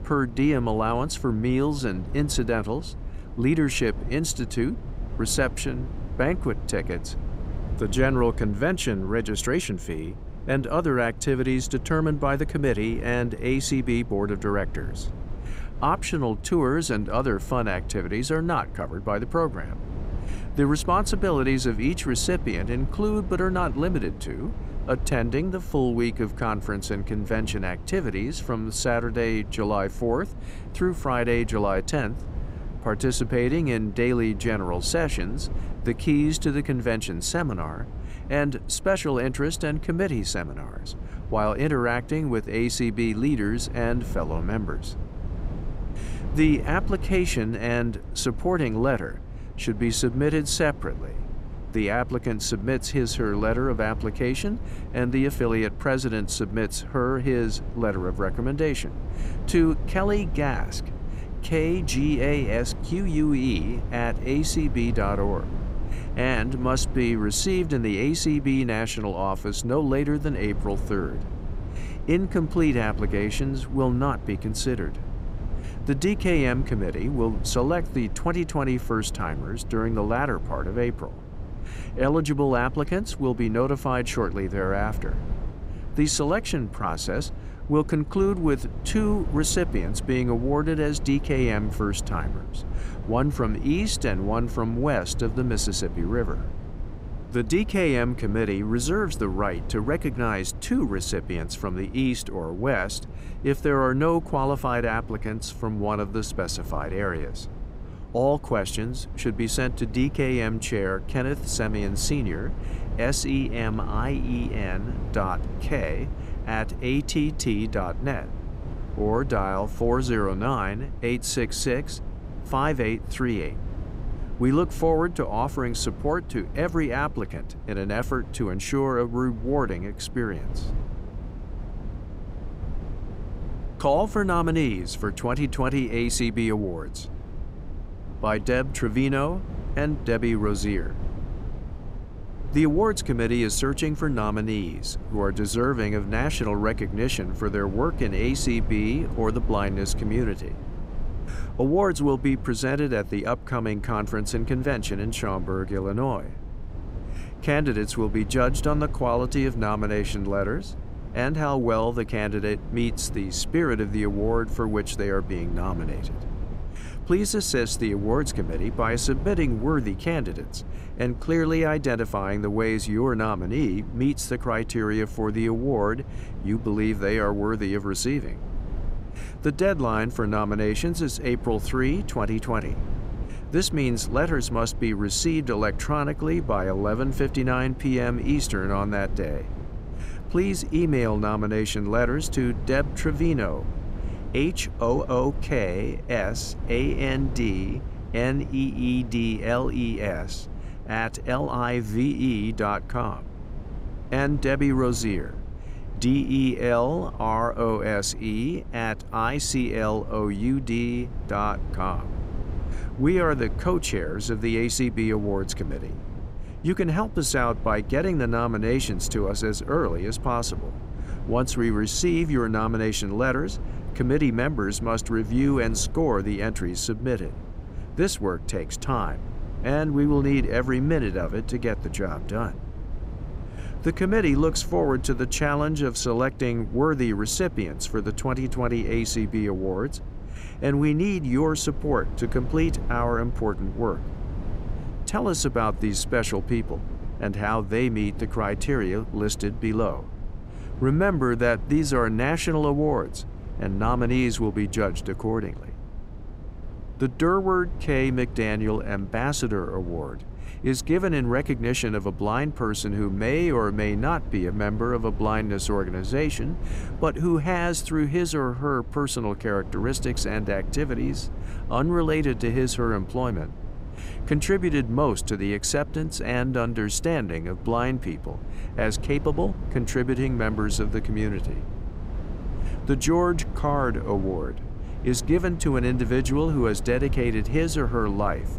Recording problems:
low rumble; noticeable; throughout; 20 dB below the speech

